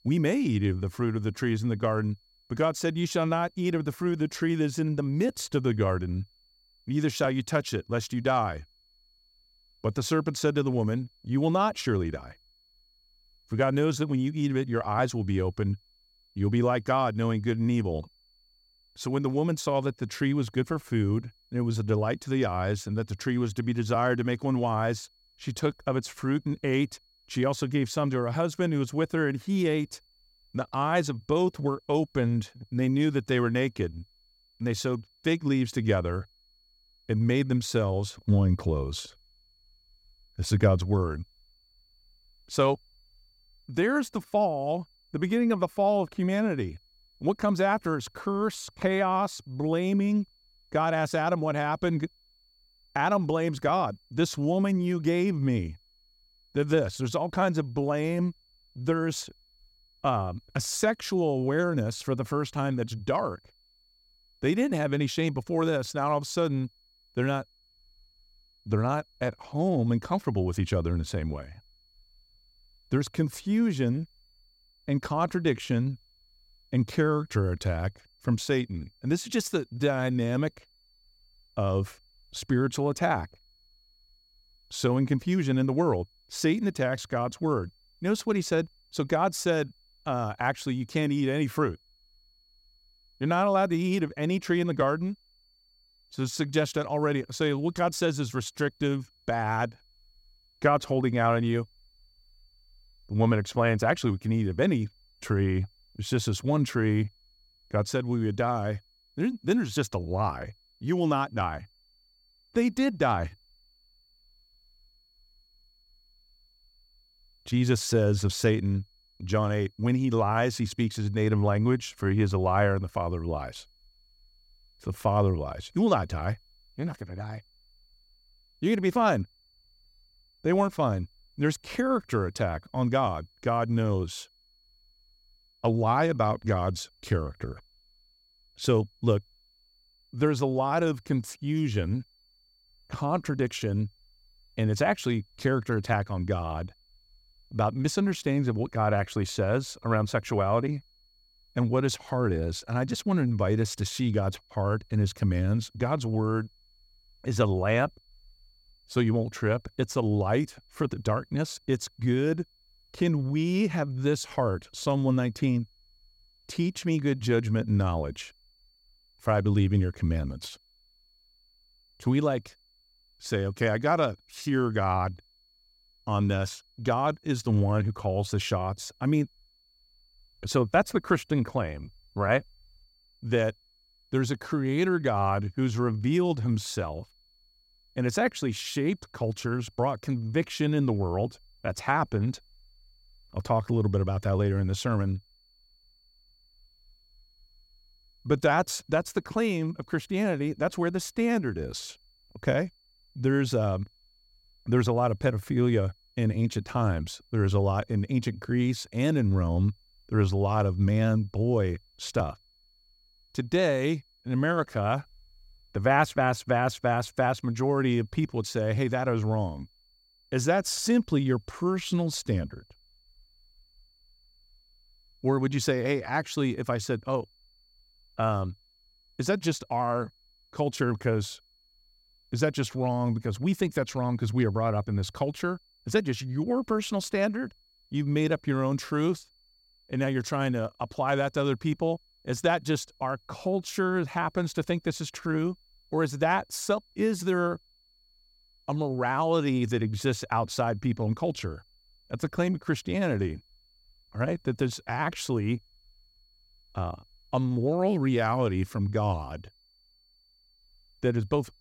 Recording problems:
high-pitched whine; faint; throughout; 4.5 kHz, 35 dB below the speech

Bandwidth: 16 kHz